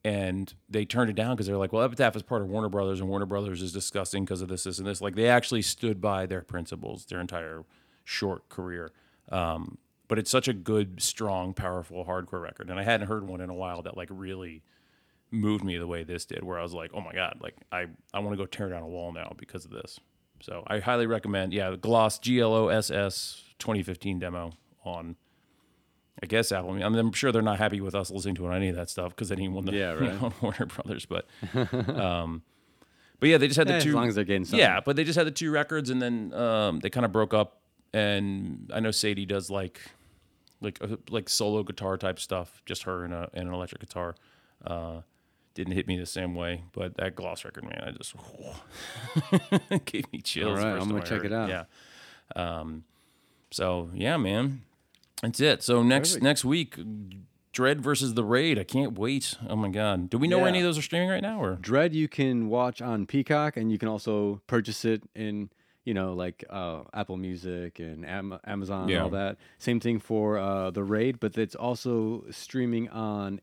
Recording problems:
none

